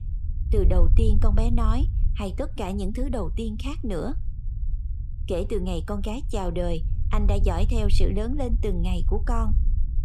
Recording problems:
low rumble; noticeable; throughout; 15 dB below the speech

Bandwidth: 14 kHz